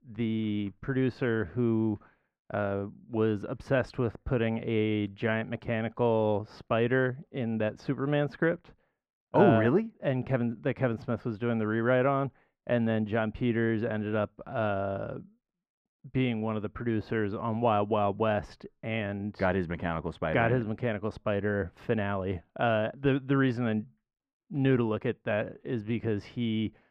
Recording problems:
muffled; very; fading above 3.5 kHz

